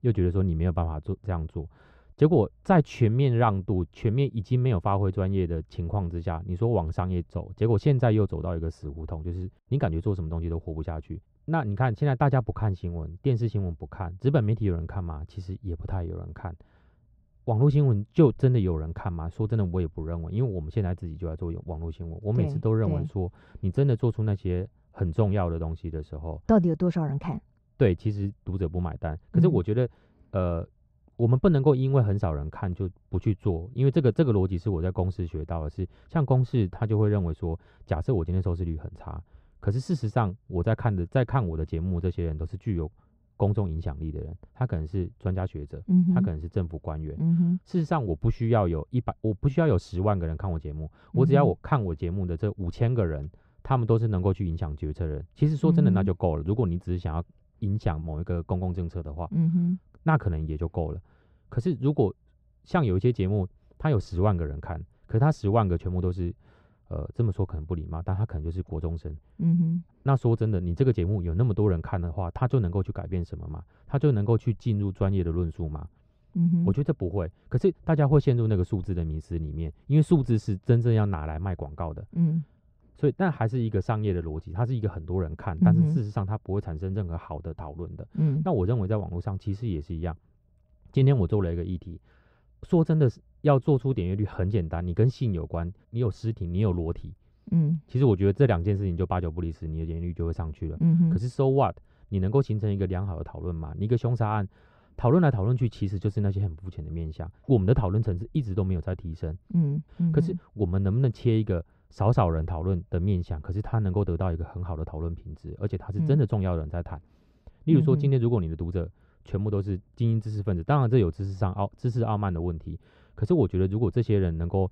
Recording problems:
muffled; very; fading above 1.5 kHz

